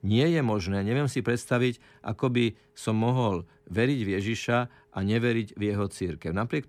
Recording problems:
none

